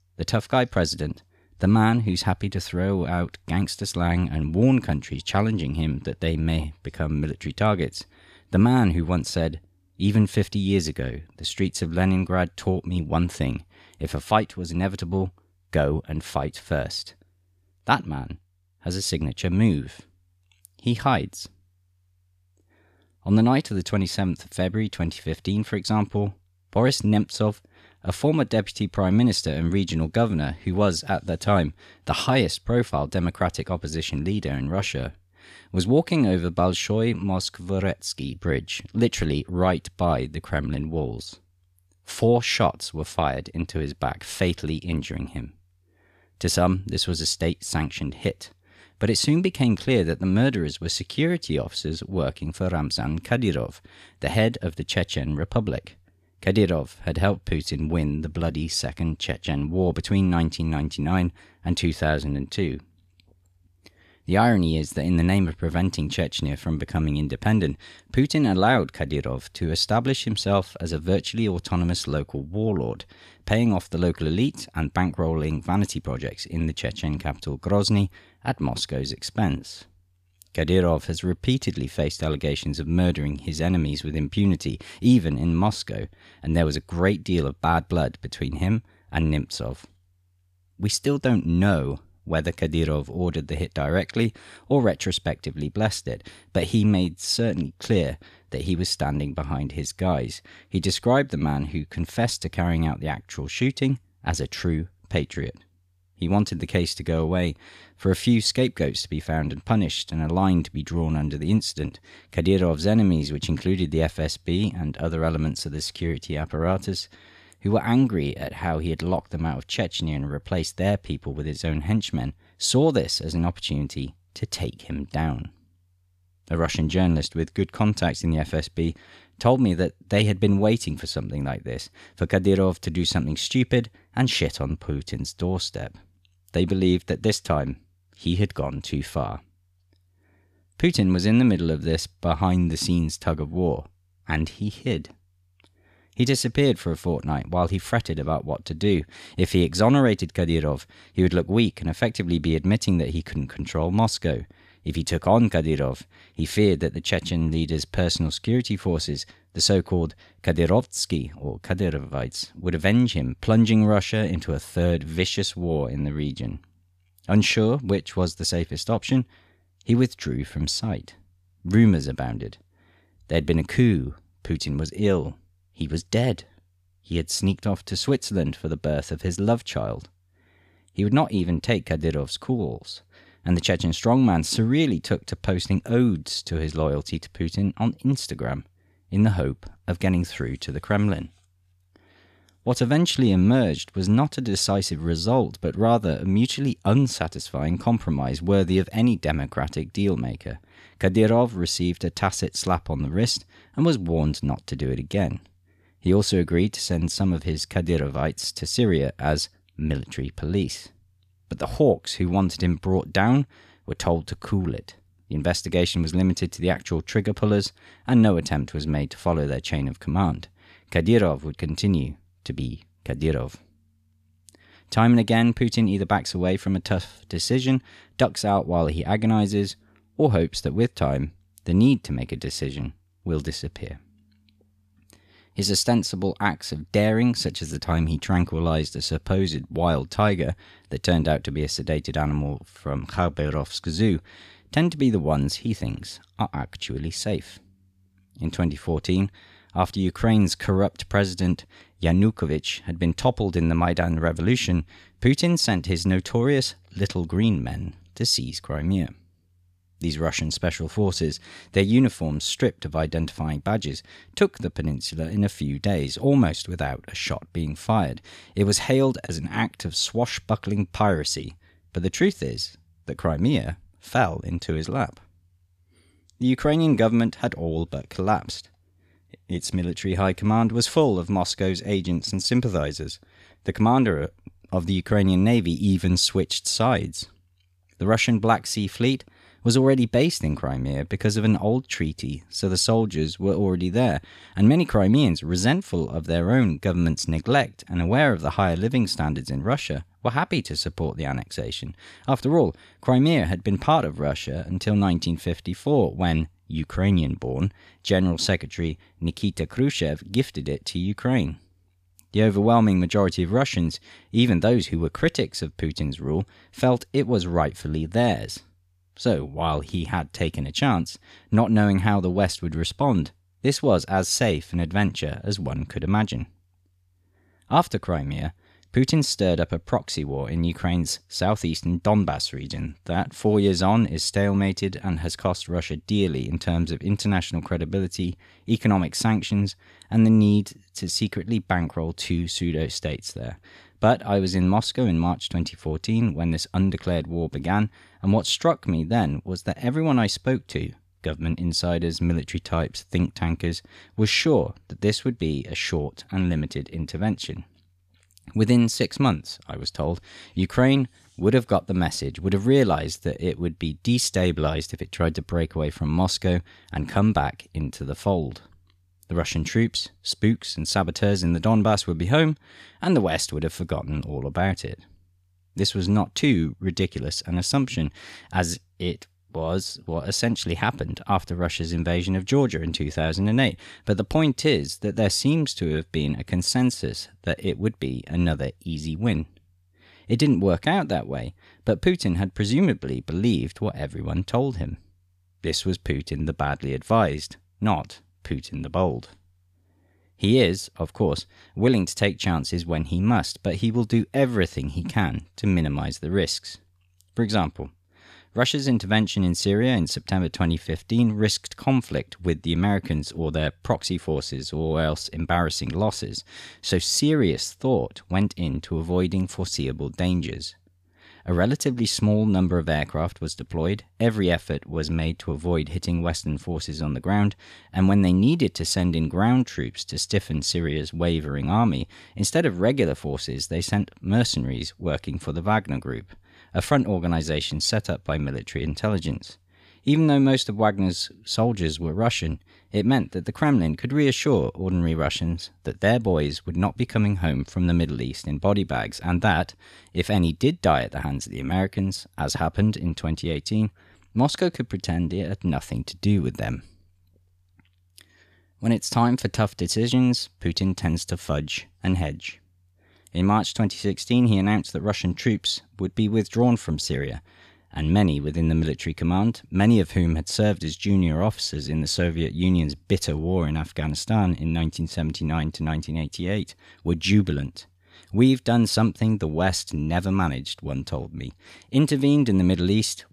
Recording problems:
none

